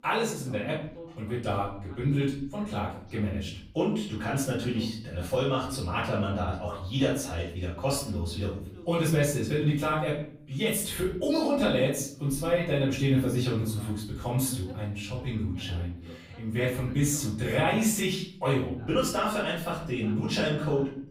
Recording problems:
off-mic speech; far
room echo; noticeable; dies away in 0.6 s
voice in the background; faint; throughout; 25 dB below the speech

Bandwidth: 15.5 kHz